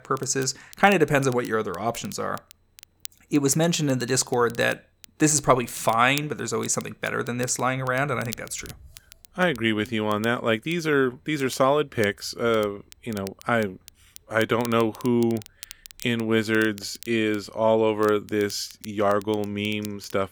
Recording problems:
crackle, like an old record; faint; 20 dB below the speech

